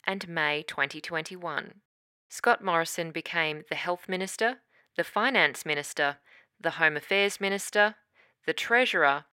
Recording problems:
thin; somewhat; fading below 400 Hz

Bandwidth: 16 kHz